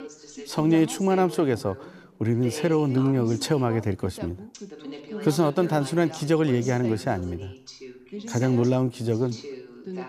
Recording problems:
background chatter; noticeable; throughout; 2 voices, 15 dB below the speech

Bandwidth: 14.5 kHz